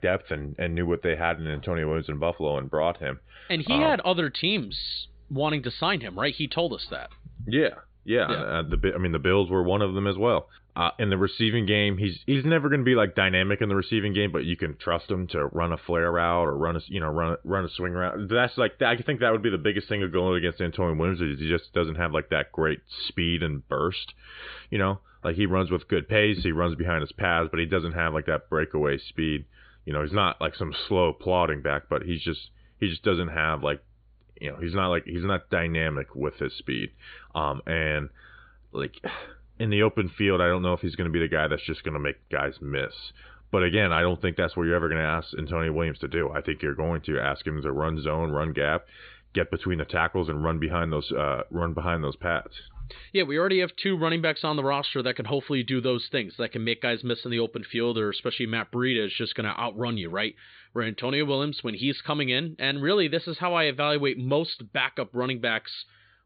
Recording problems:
high frequencies cut off; severe; nothing above 4.5 kHz

